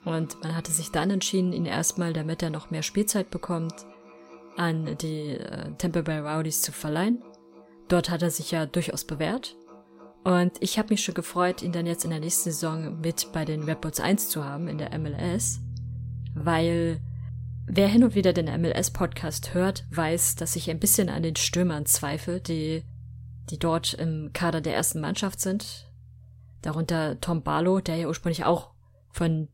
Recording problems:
background music; noticeable; throughout; 15 dB below the speech

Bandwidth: 16 kHz